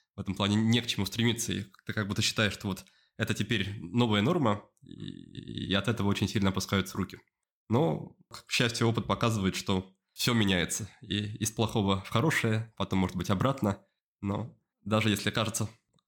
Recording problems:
none

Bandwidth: 17 kHz